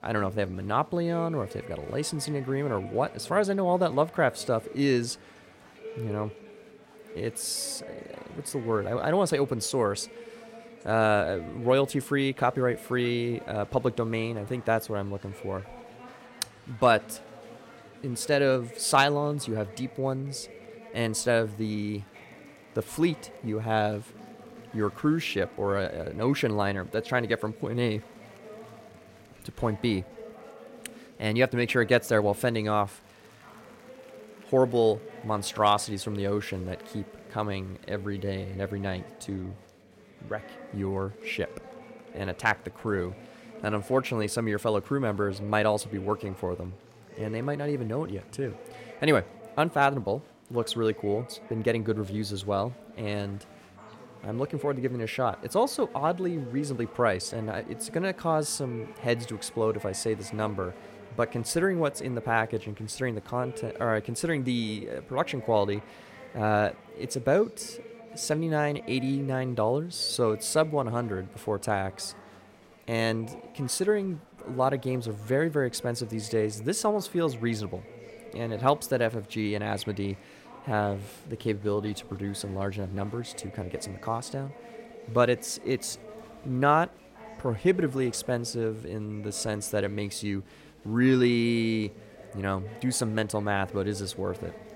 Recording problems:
chatter from many people; noticeable; throughout; 20 dB below the speech

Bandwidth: 16 kHz